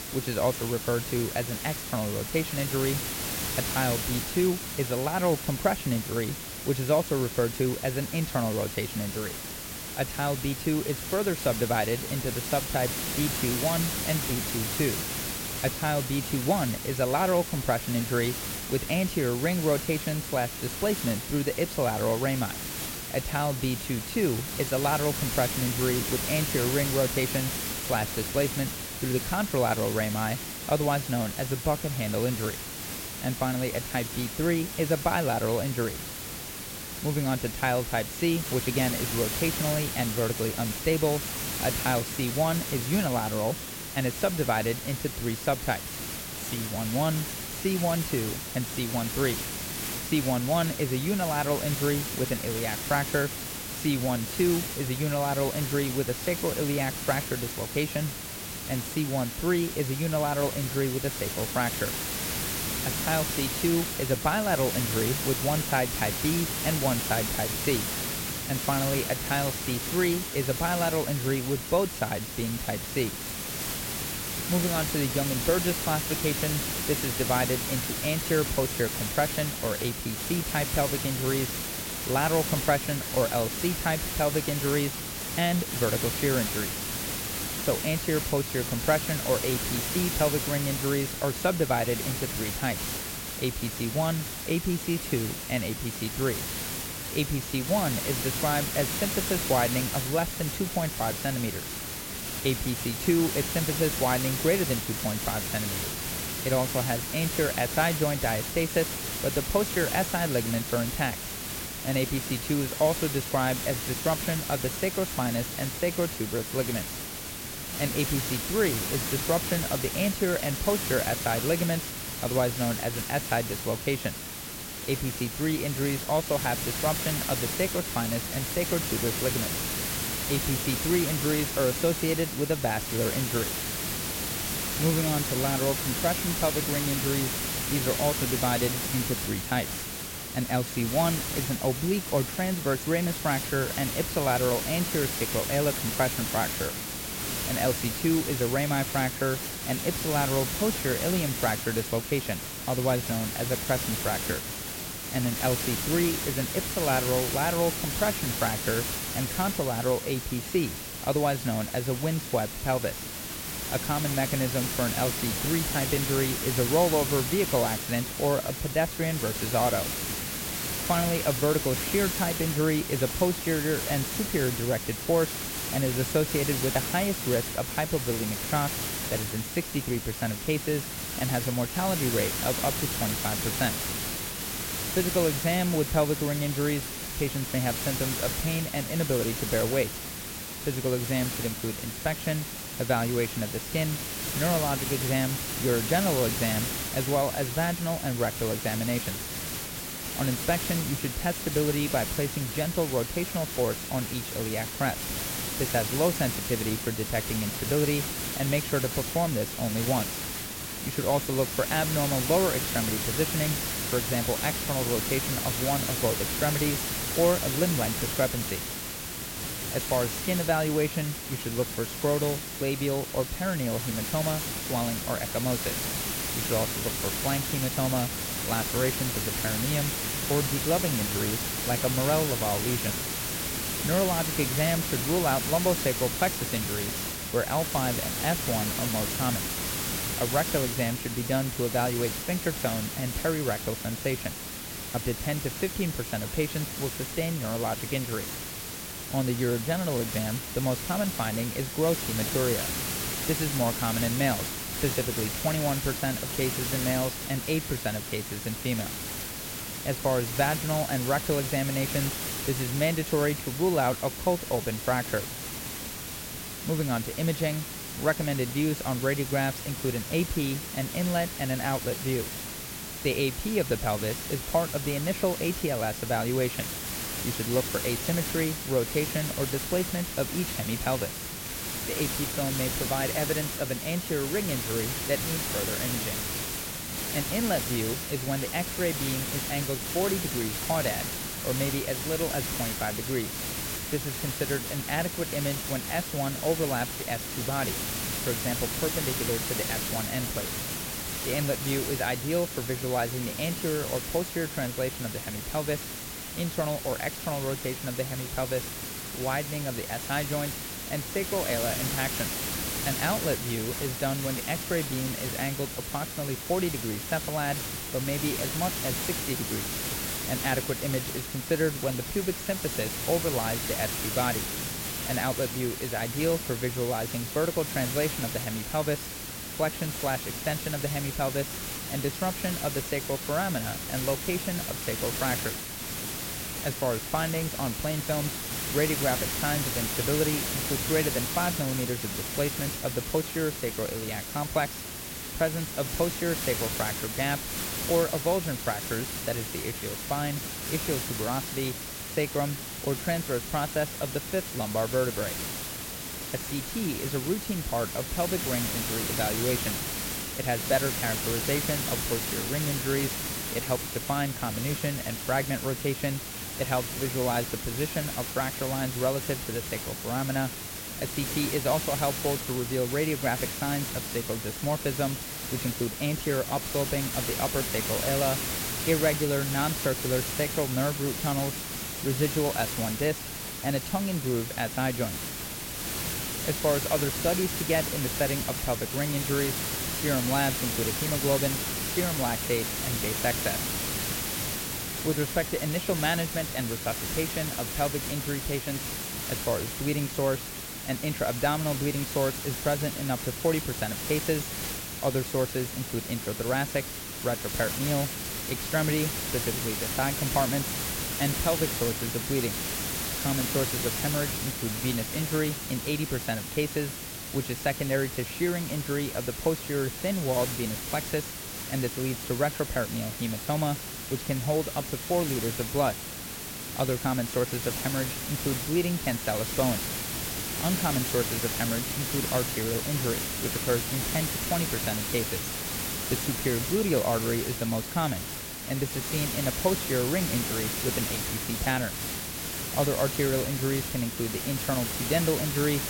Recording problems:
hiss; loud; throughout; 1 dB below the speech

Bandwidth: 16.5 kHz